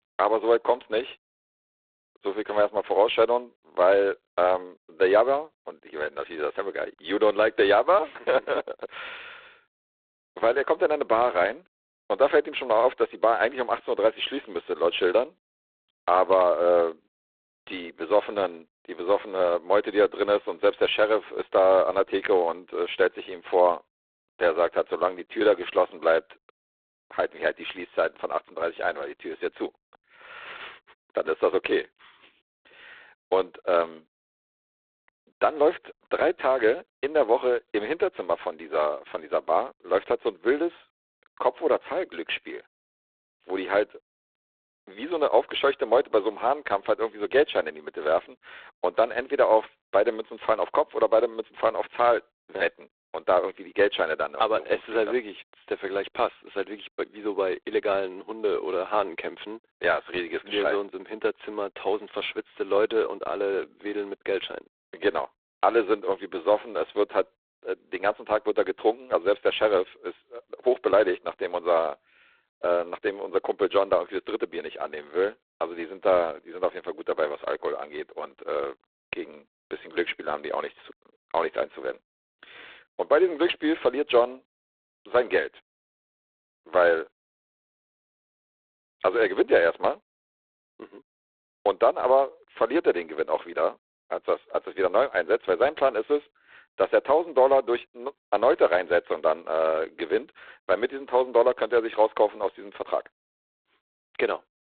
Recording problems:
phone-call audio; poor line; nothing above 3.5 kHz

